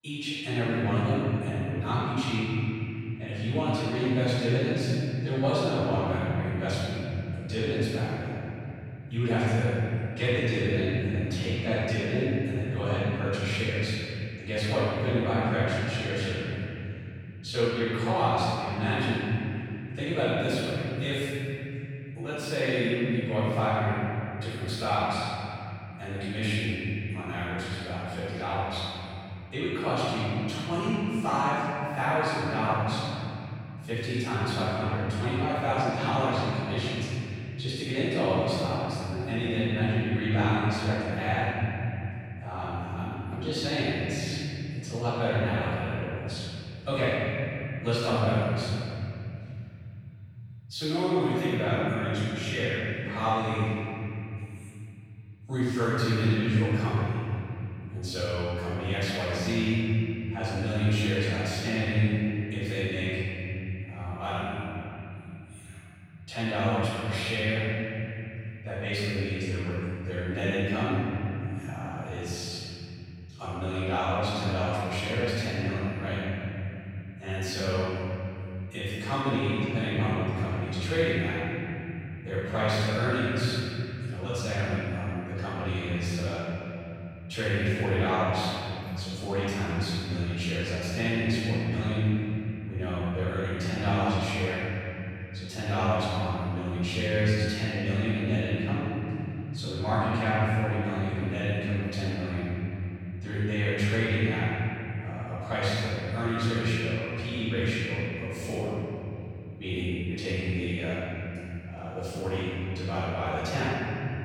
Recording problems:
room echo; strong; dies away in 3 s
off-mic speech; far

